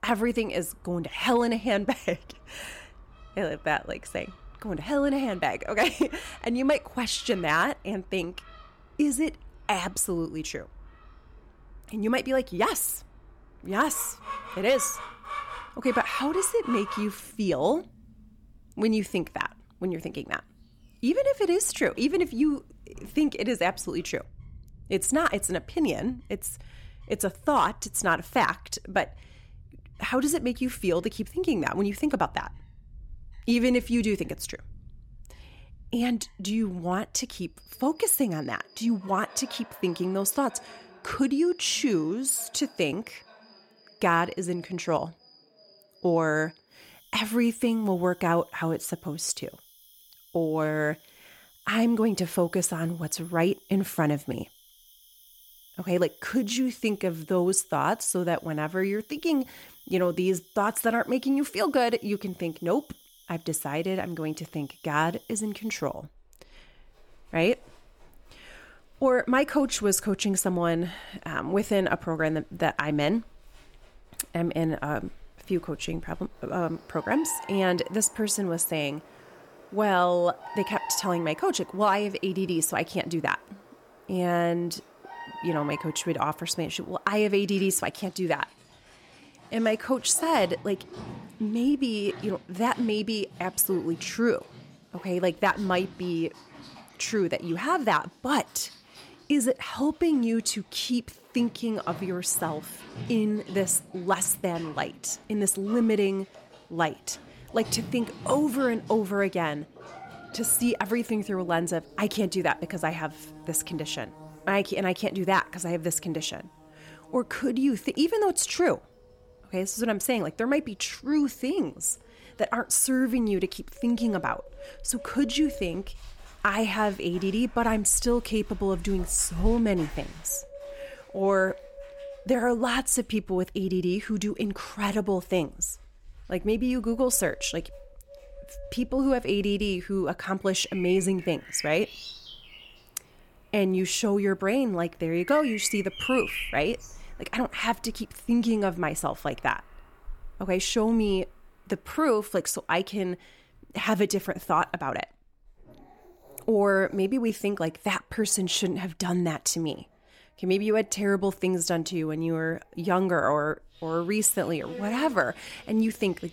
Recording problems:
animal sounds; noticeable; throughout; 20 dB below the speech

